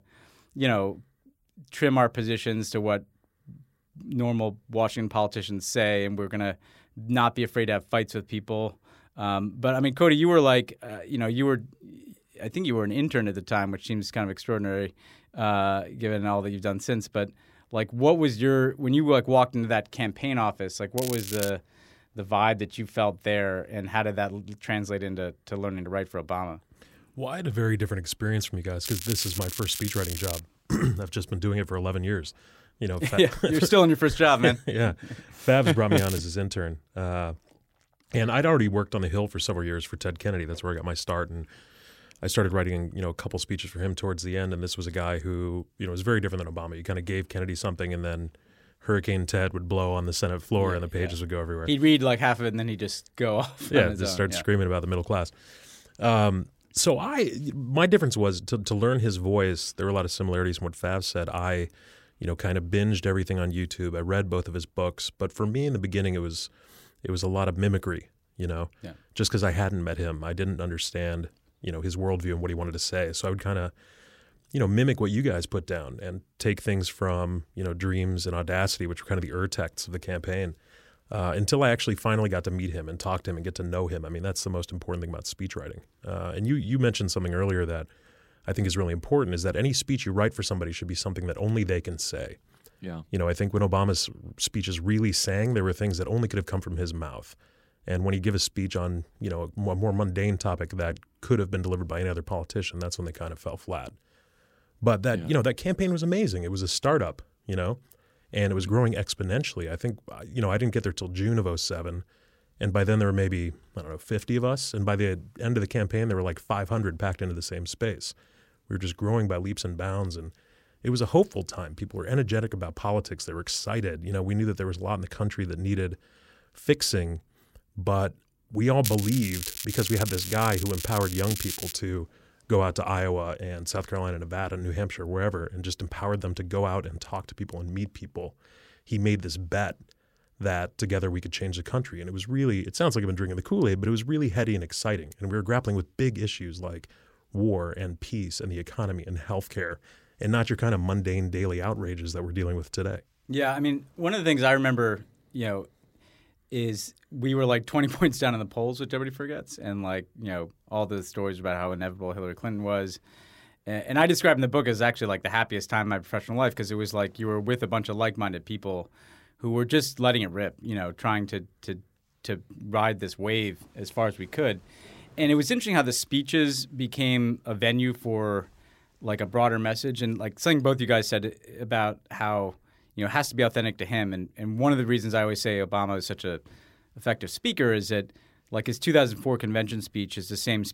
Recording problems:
crackling; loud; 4 times, first at 21 s; 6 dB below the speech

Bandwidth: 16 kHz